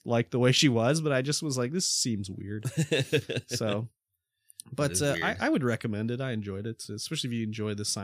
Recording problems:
abrupt cut into speech; at the end

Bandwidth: 14.5 kHz